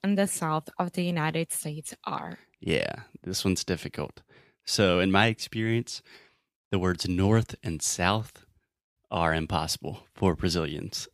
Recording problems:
none

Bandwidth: 15 kHz